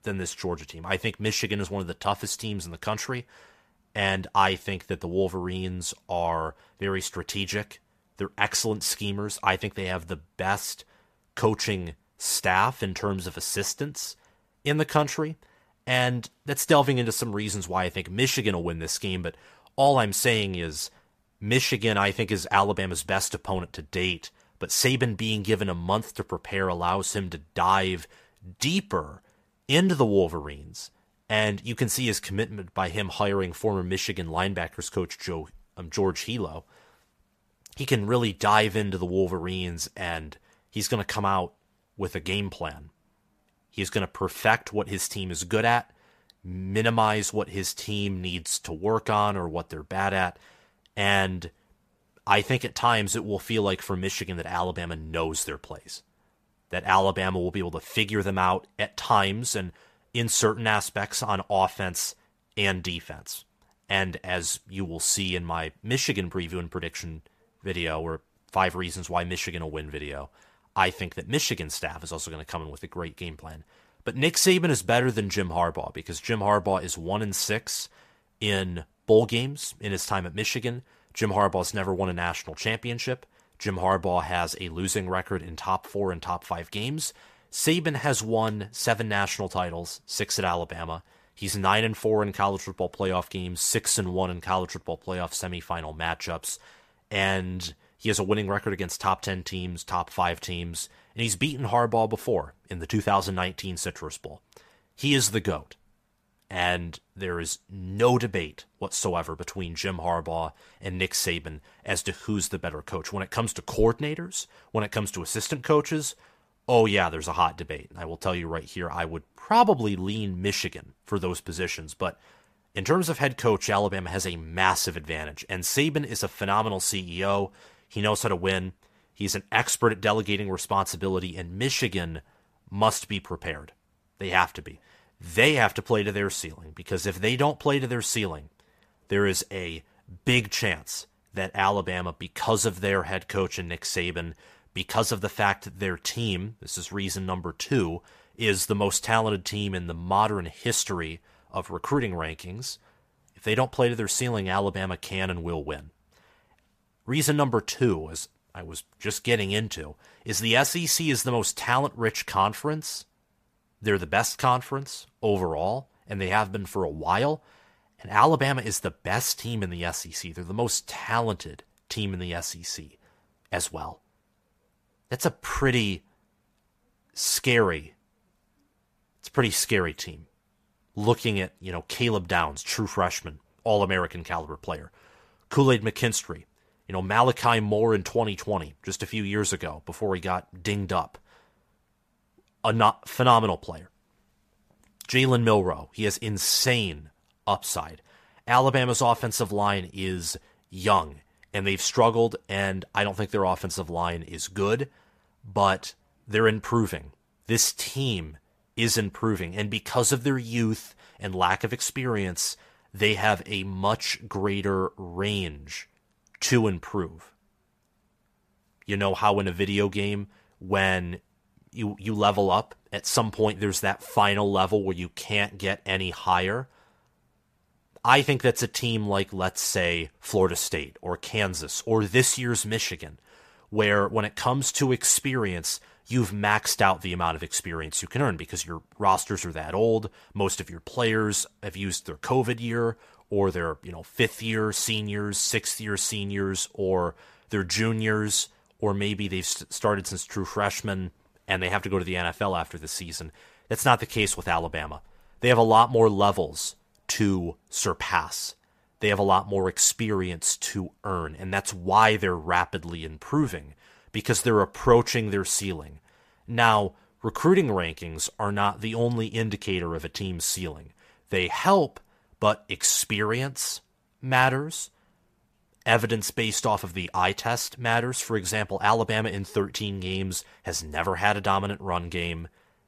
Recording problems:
none

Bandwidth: 14.5 kHz